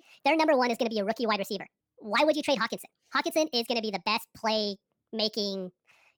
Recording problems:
wrong speed and pitch; too fast and too high; 1.5 times normal speed

